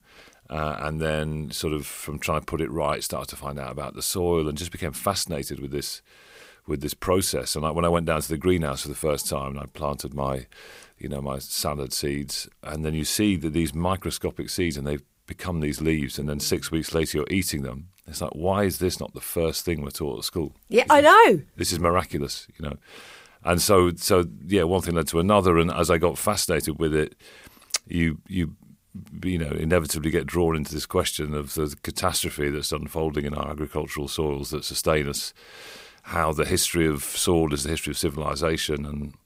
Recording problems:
none

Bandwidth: 15.5 kHz